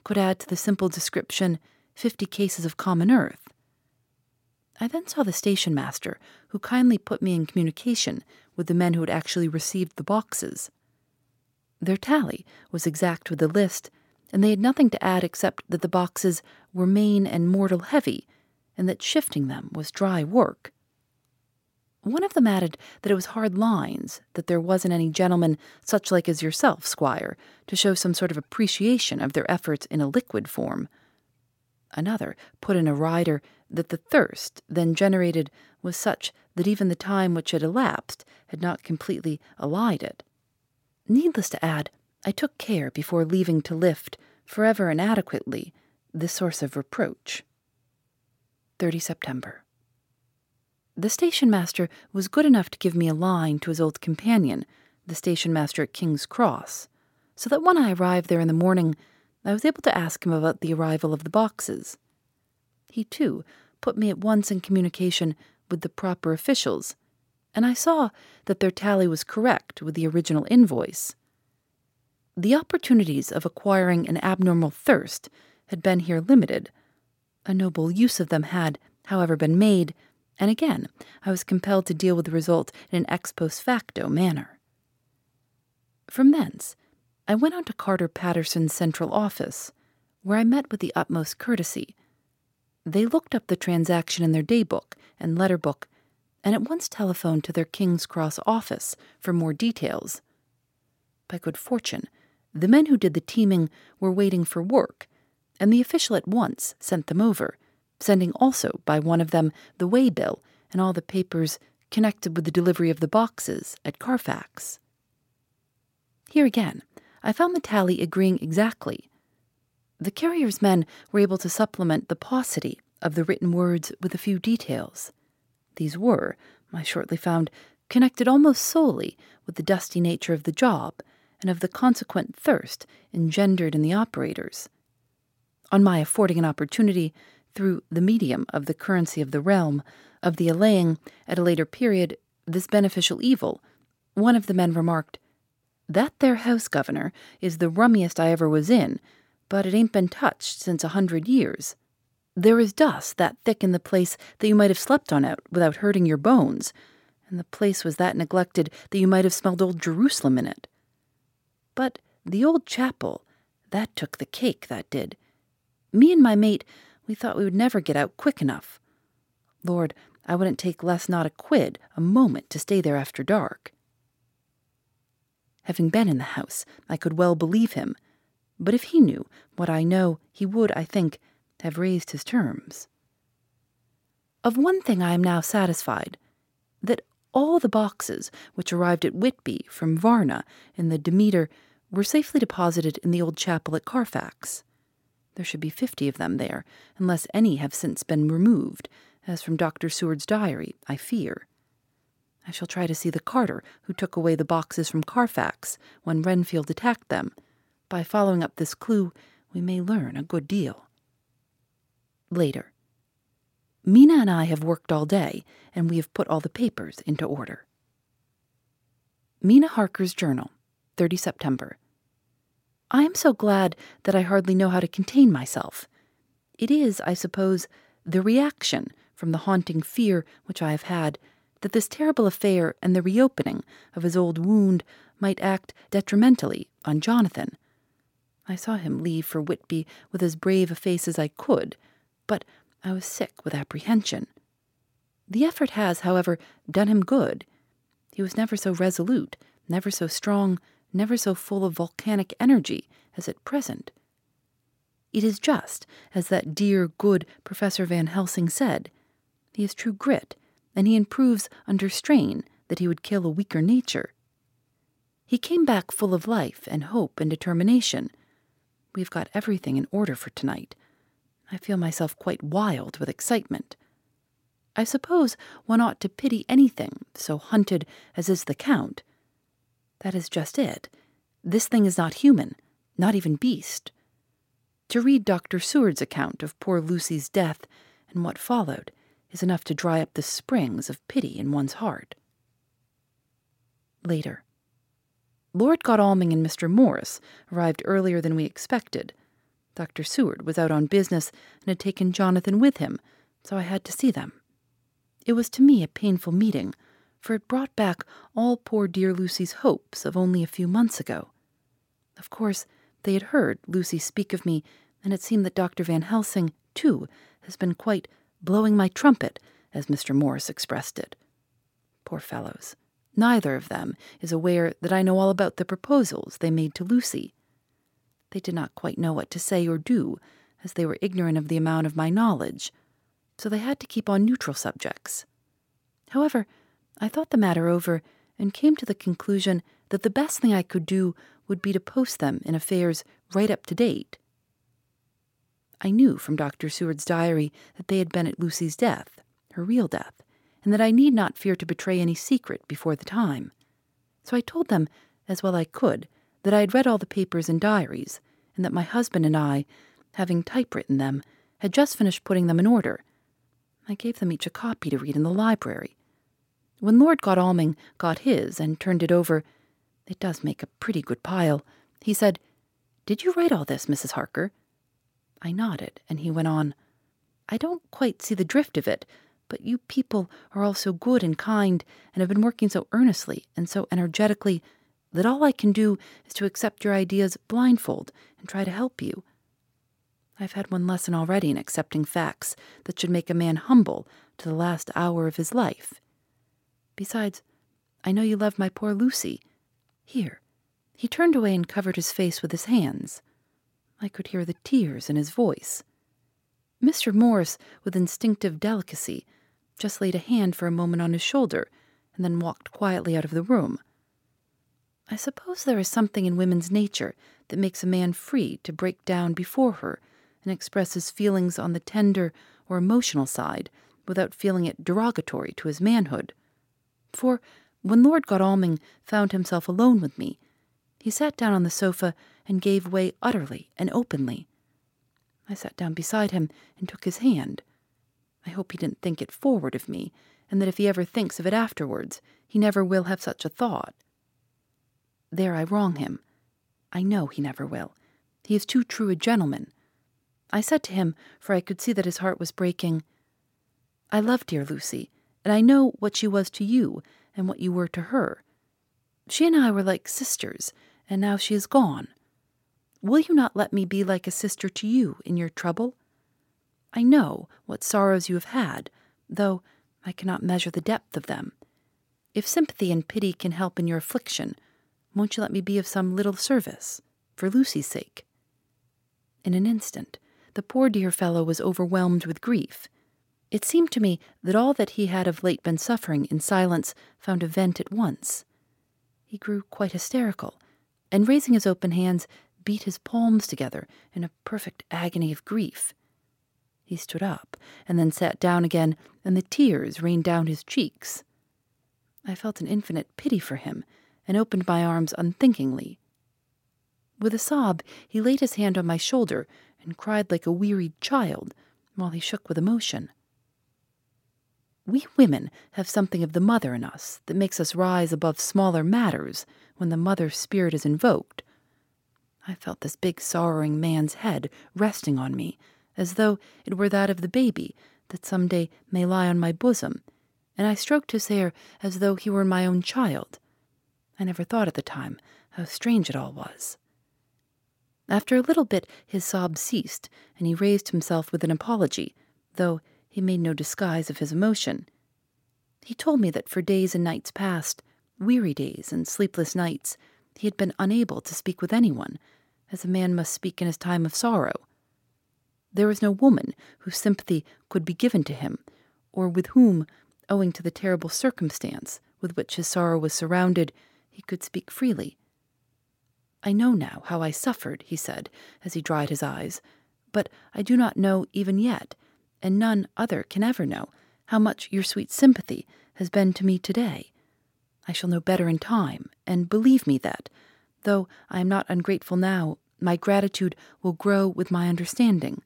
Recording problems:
none

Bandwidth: 16.5 kHz